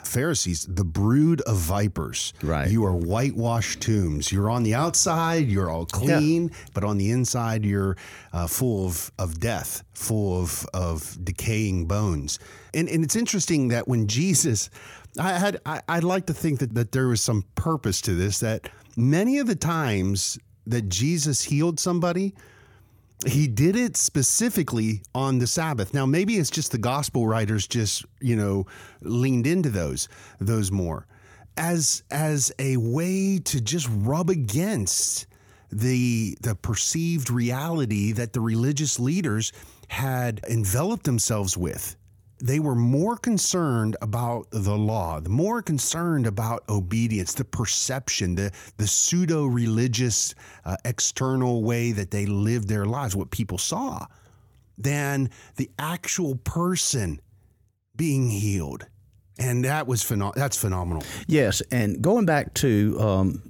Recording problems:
none

